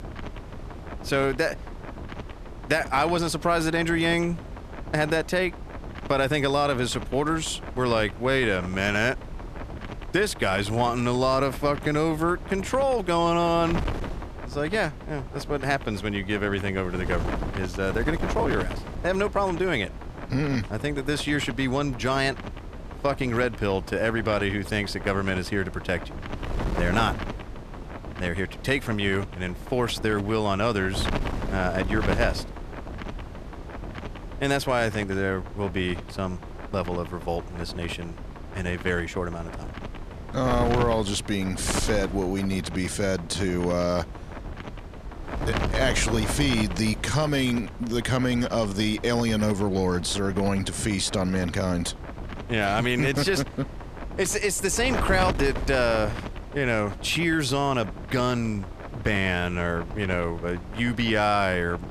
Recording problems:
wind noise on the microphone; occasional gusts; 10 dB below the speech

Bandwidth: 14.5 kHz